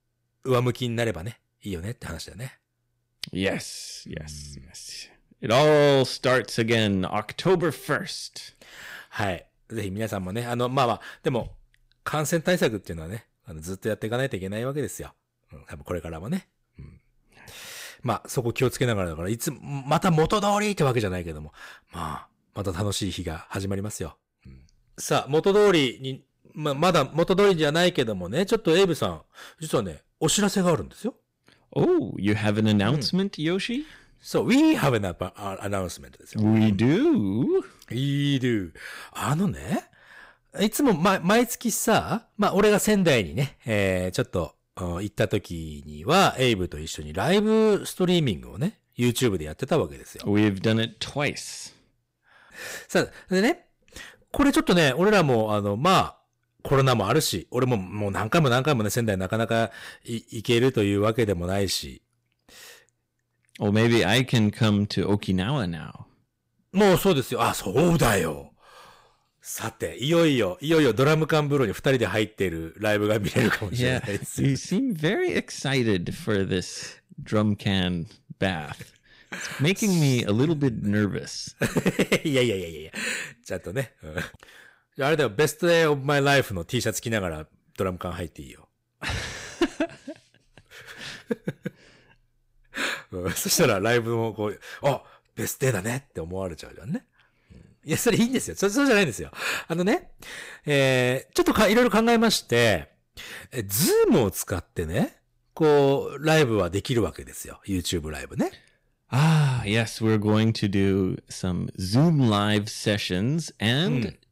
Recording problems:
distortion; slight; 5% of the sound clipped

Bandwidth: 15.5 kHz